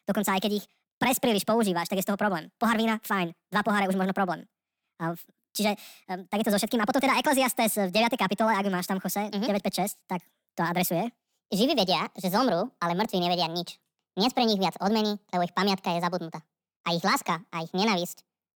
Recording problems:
wrong speed and pitch; too fast and too high; 1.5 times normal speed

